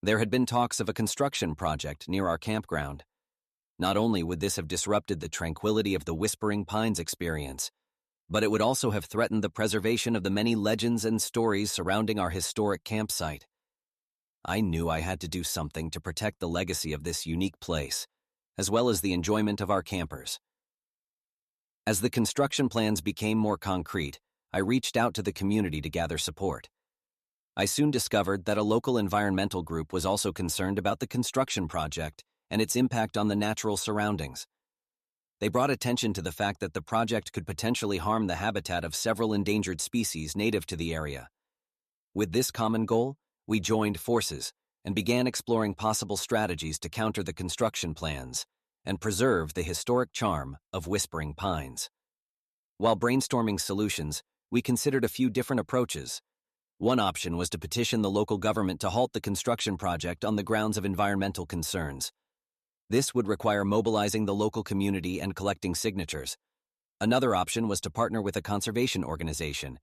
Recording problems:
none

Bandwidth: 14 kHz